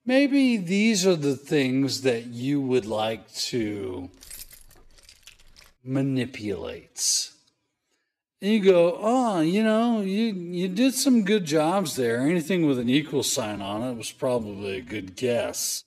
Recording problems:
wrong speed, natural pitch; too slow; 0.6 times normal speed
jangling keys; faint; from 4 to 5.5 s; peak 15 dB below the speech

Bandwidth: 14.5 kHz